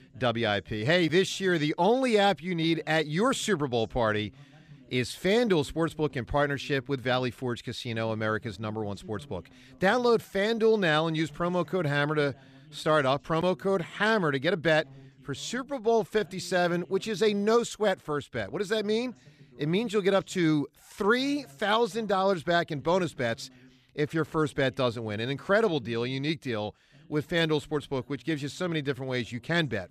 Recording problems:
voice in the background; faint; throughout; 25 dB below the speech

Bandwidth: 14.5 kHz